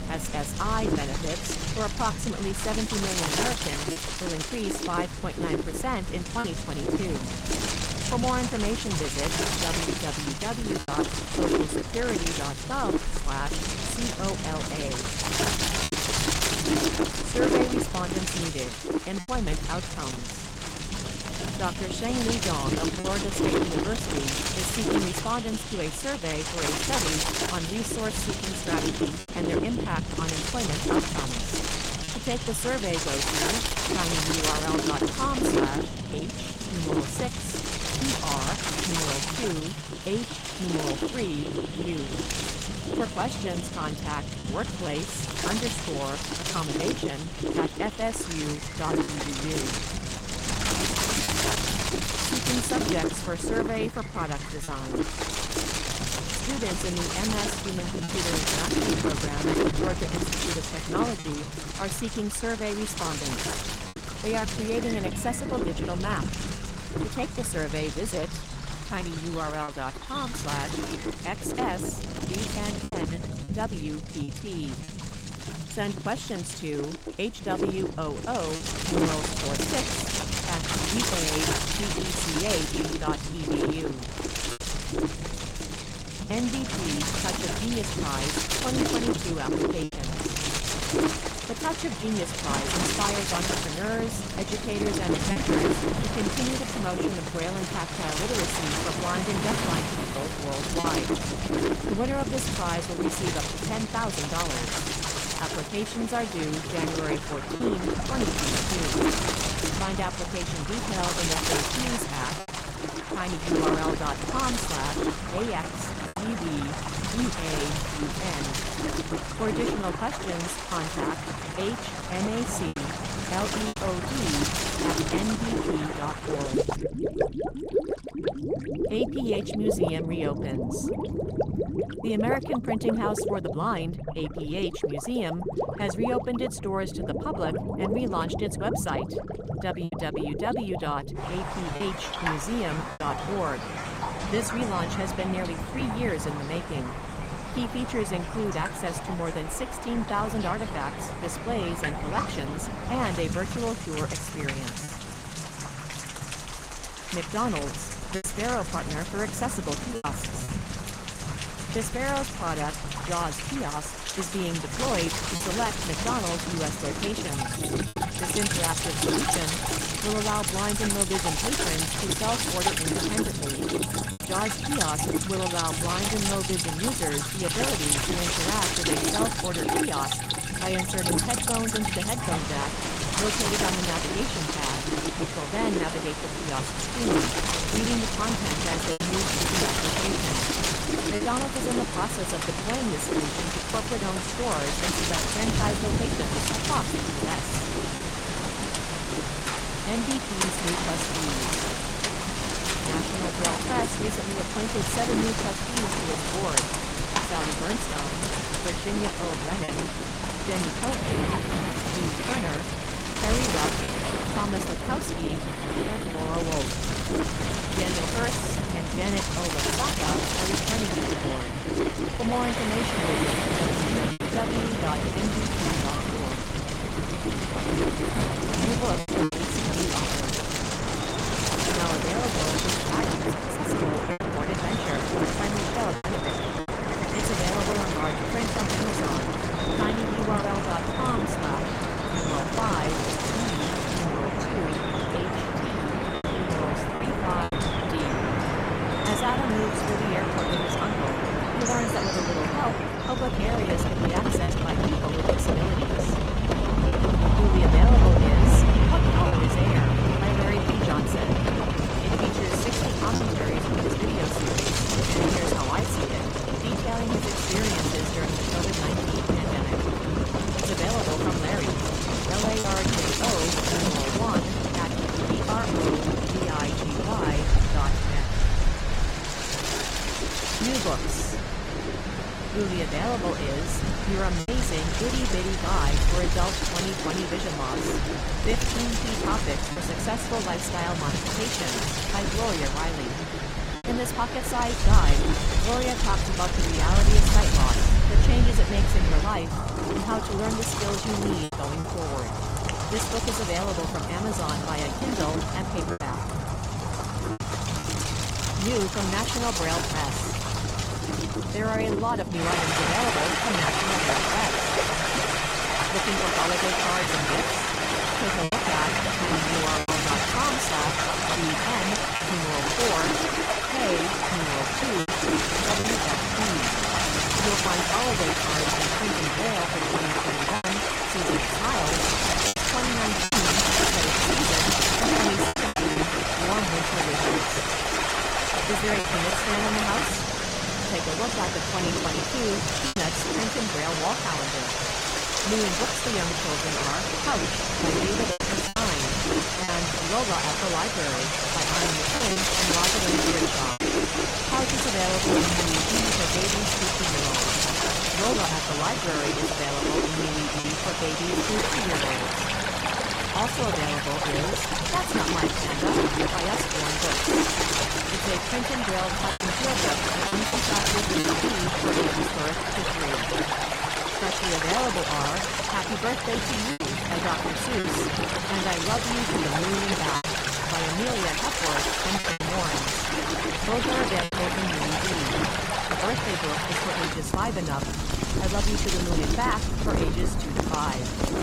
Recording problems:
garbled, watery; slightly; nothing above 16 kHz
rain or running water; very loud; throughout; 3 dB above the speech
wind noise on the microphone; heavy; until 2:07, from 2:45 to 4:04 and from 4:22 on; 2 dB above the speech
low rumble; noticeable; throughout; 15 dB below the speech
choppy; occasionally; 2% of the speech affected

